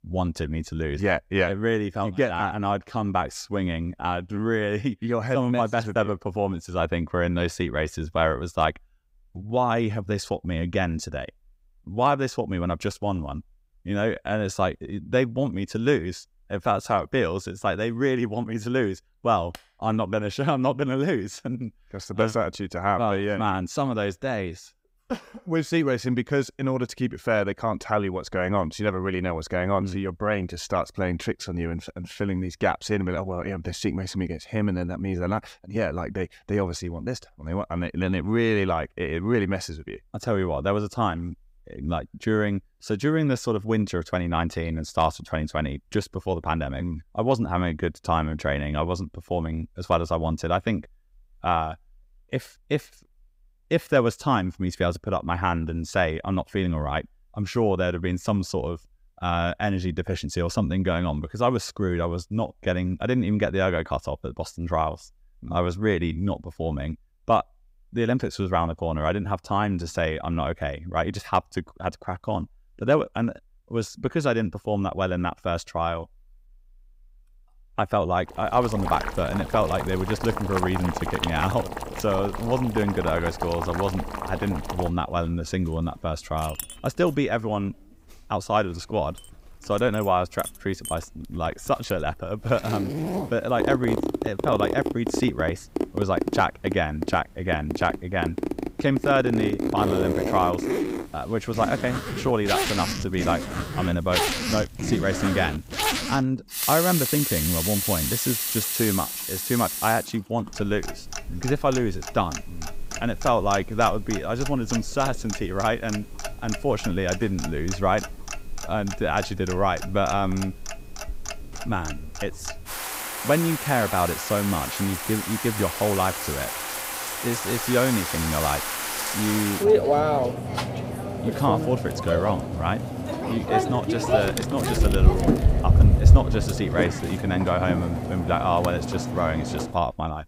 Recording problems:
household noises; loud; from 1:19 on; 1 dB below the speech

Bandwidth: 15.5 kHz